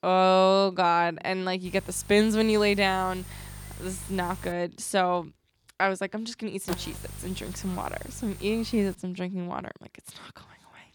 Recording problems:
electrical hum; noticeable; from 1.5 to 4.5 s and from 6.5 to 9 s; 50 Hz, 20 dB below the speech

